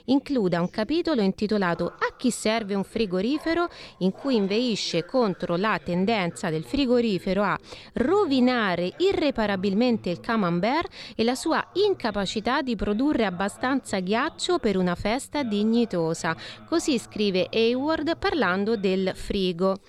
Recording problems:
voice in the background; faint; throughout; 25 dB below the speech

